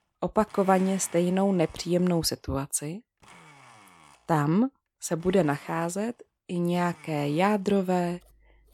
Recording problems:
household noises; faint; throughout; 25 dB below the speech

